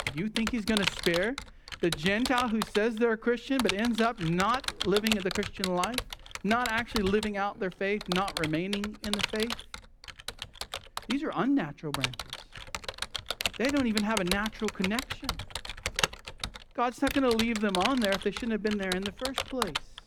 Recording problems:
household noises; loud; throughout; 4 dB below the speech

